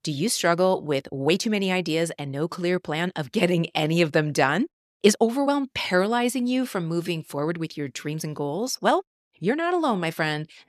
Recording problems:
uneven, jittery; strongly; from 0.5 to 9.5 s

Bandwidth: 14 kHz